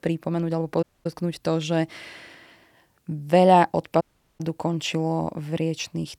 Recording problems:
audio cutting out; at 1 s and at 4 s

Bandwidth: 19 kHz